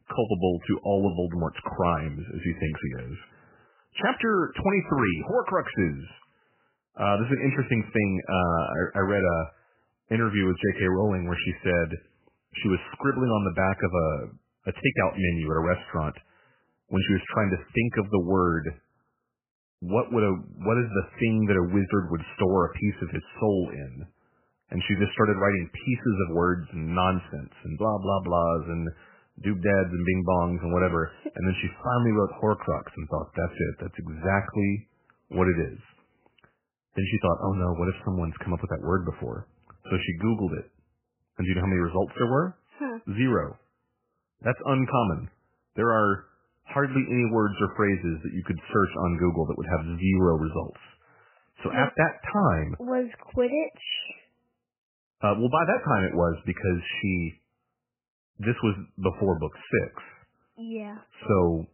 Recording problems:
garbled, watery; badly; nothing above 3 kHz

